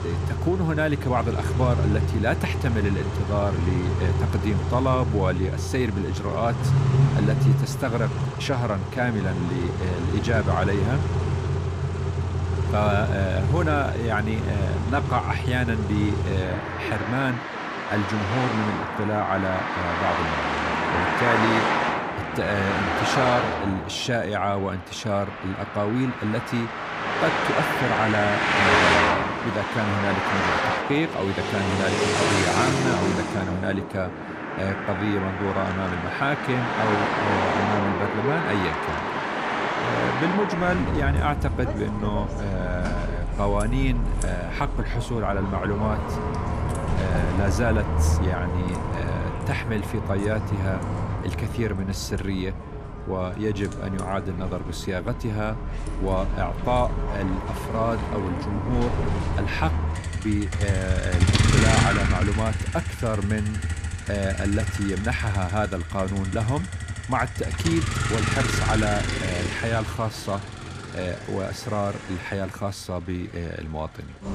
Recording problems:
traffic noise; very loud; throughout; 1 dB above the speech

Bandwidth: 15 kHz